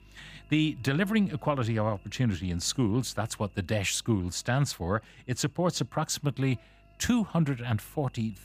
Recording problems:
electrical hum; faint; throughout; 50 Hz, 30 dB below the speech

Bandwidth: 15 kHz